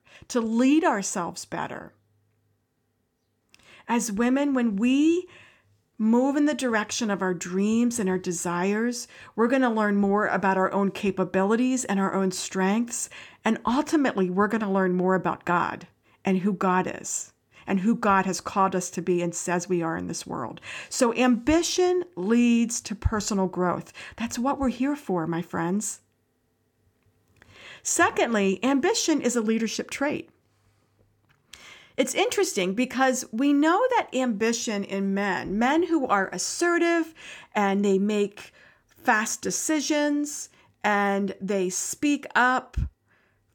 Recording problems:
none

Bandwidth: 18 kHz